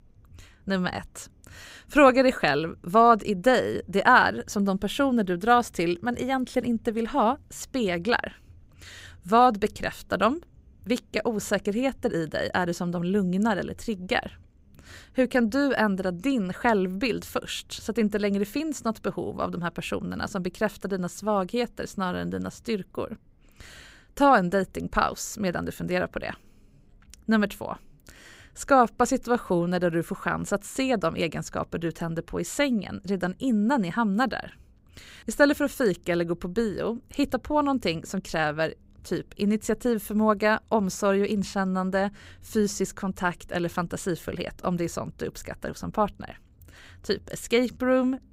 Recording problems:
none

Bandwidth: 15.5 kHz